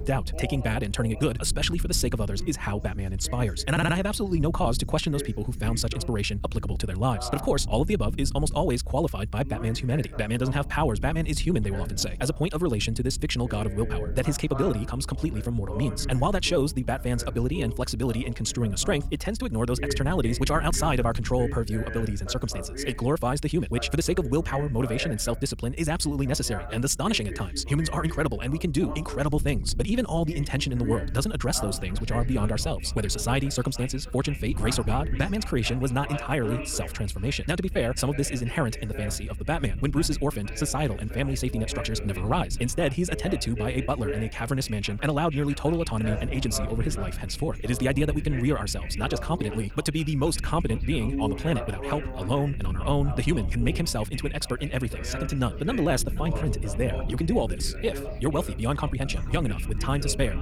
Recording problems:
wrong speed, natural pitch; too fast; 1.7 times normal speed
echo of what is said; faint; from 32 s on; 480 ms later, 20 dB below the speech
voice in the background; noticeable; throughout; 15 dB below the speech
low rumble; faint; throughout; 20 dB below the speech
audio stuttering; at 3.5 s

